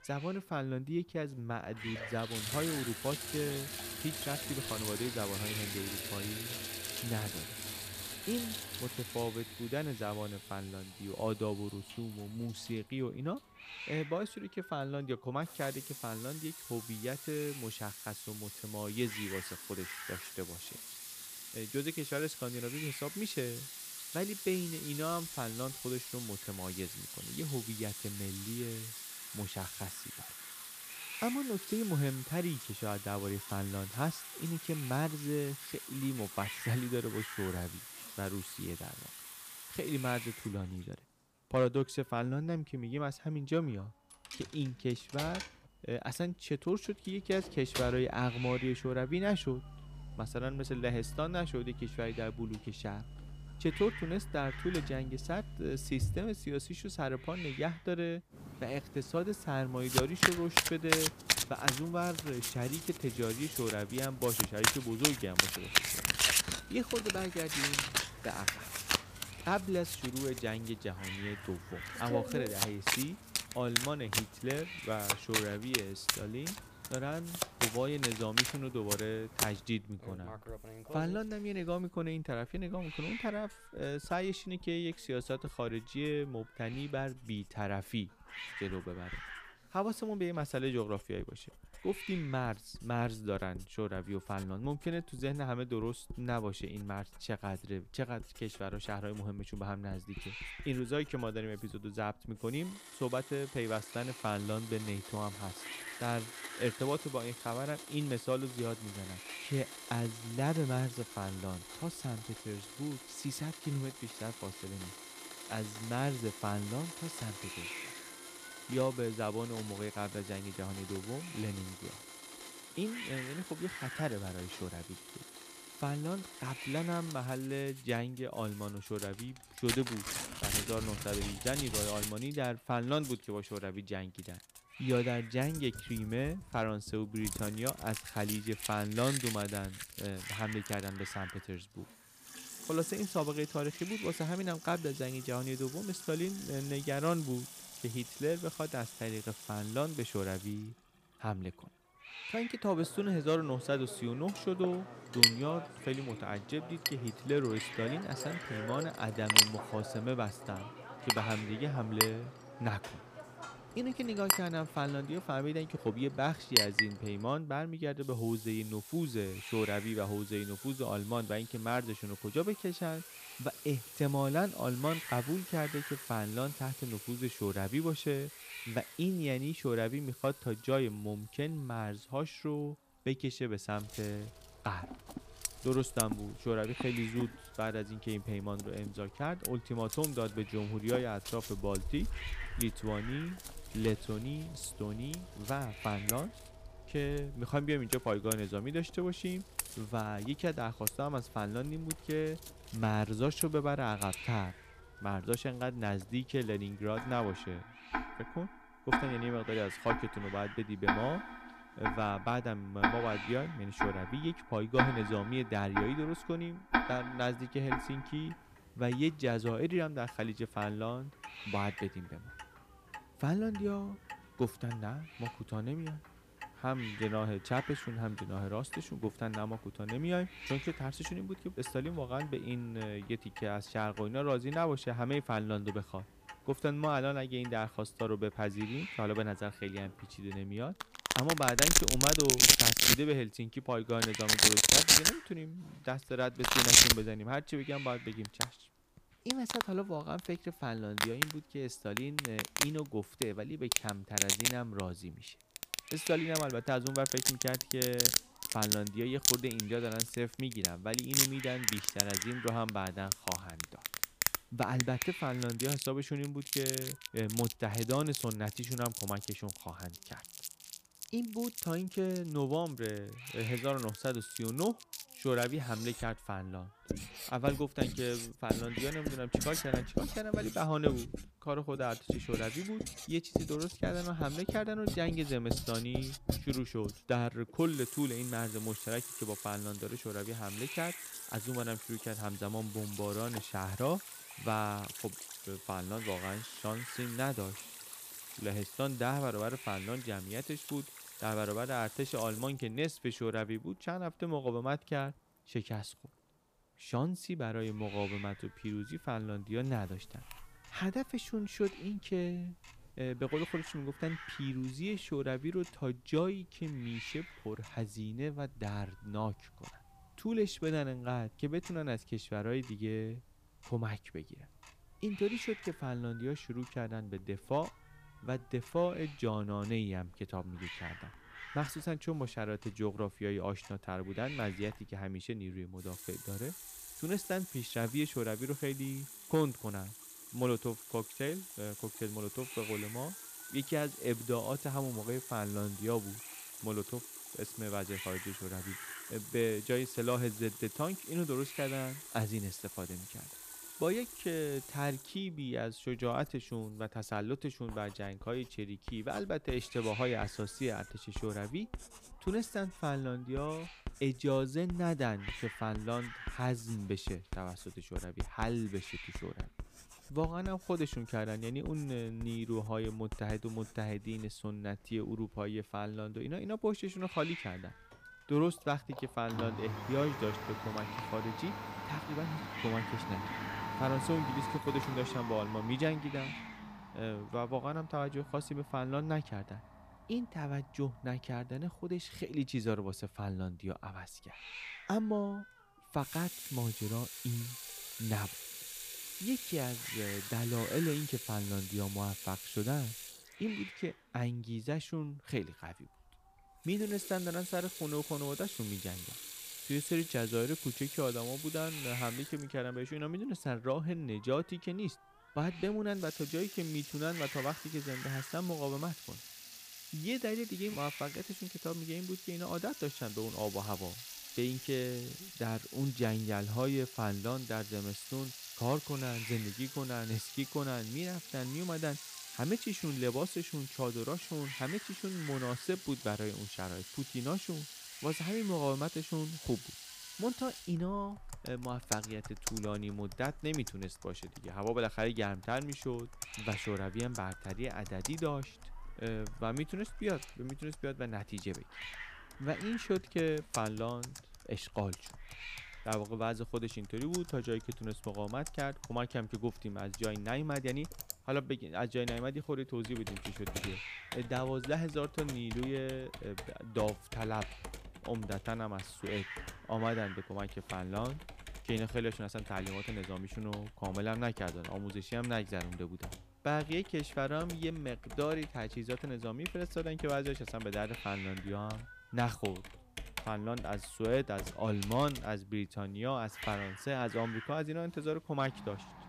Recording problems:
household noises; very loud; throughout; as loud as the speech
hiss; noticeable; throughout; 10 dB below the speech

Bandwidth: 15 kHz